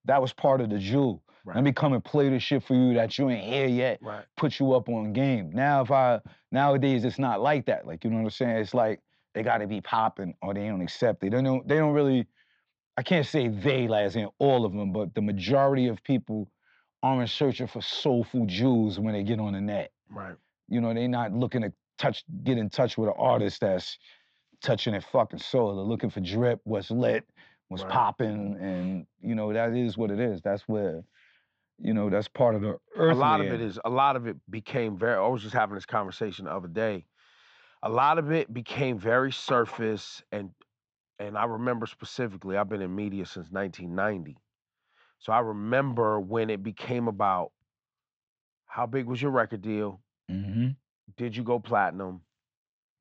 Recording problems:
high frequencies cut off; noticeable; nothing above 8 kHz
muffled; very slightly; fading above 3.5 kHz

